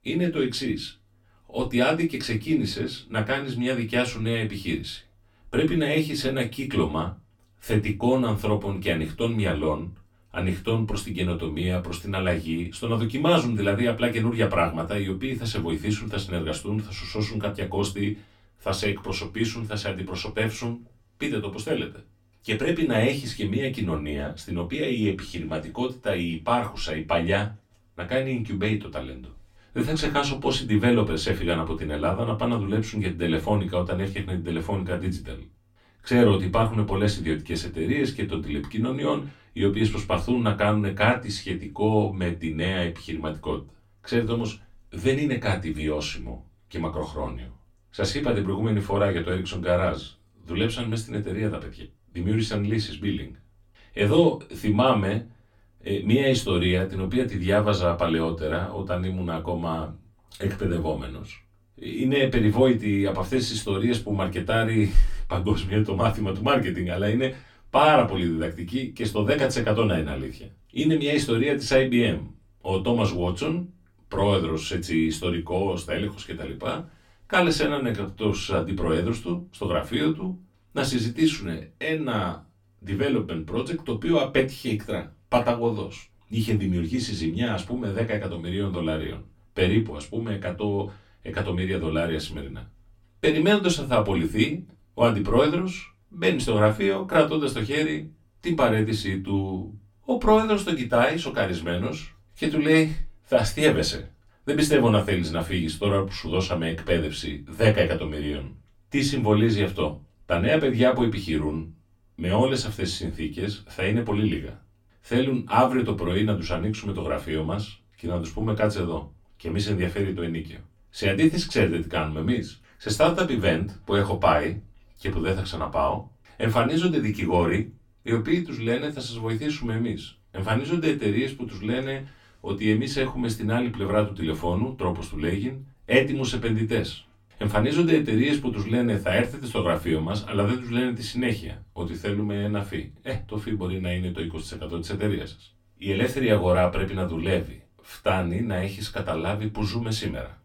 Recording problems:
off-mic speech; far
room echo; very slight; dies away in 0.2 s

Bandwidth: 17 kHz